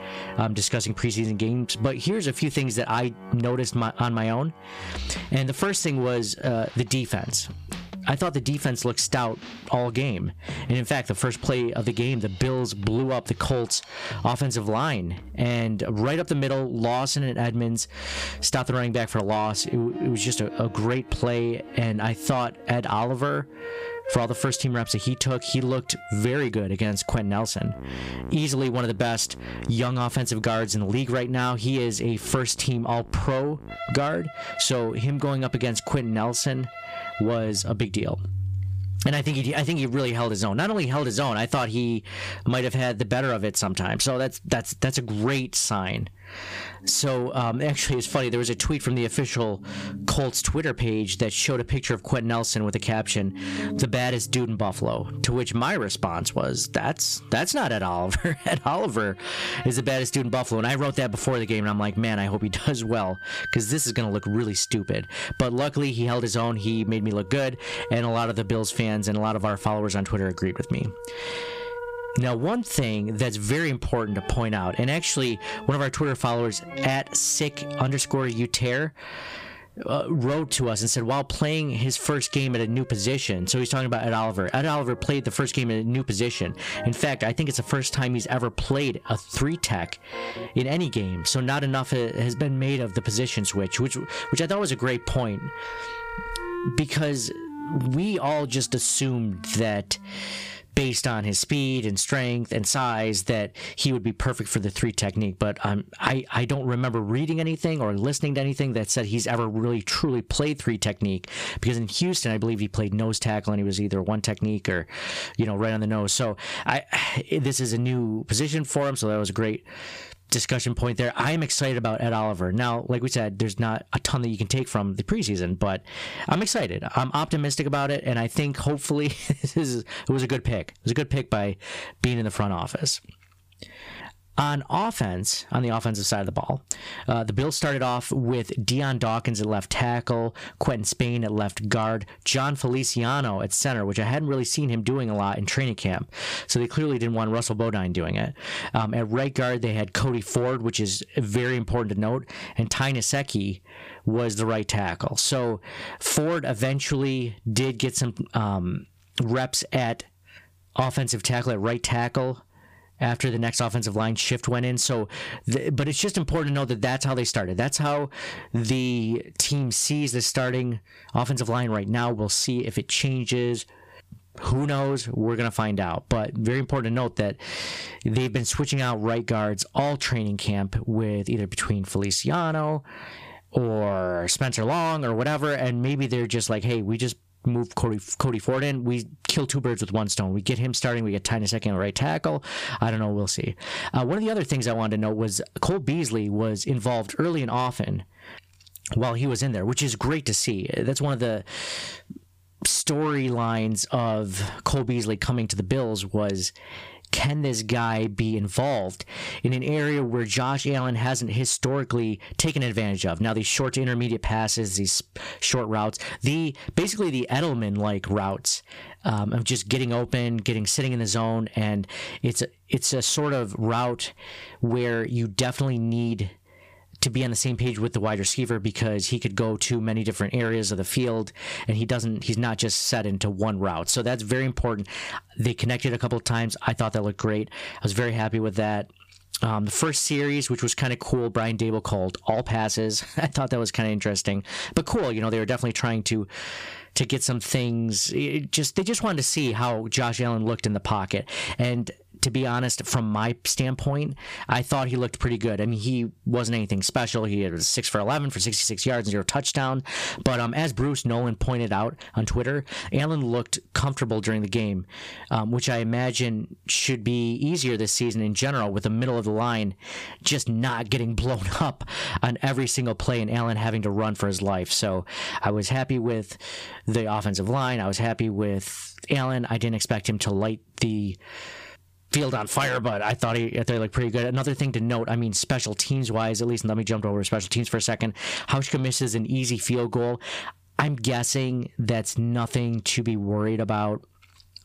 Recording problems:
distortion; slight; 10 dB below the speech
squashed, flat; somewhat, background pumping
background music; noticeable; until 1:47; 15 dB below the speech

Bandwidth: 15 kHz